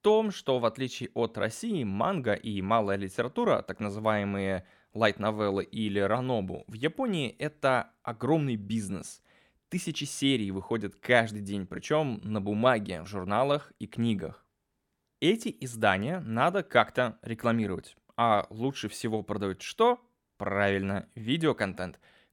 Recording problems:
none

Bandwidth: 17 kHz